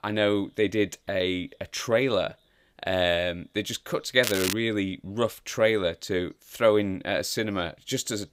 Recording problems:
crackling; loud; at 4 s; 4 dB below the speech

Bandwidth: 15.5 kHz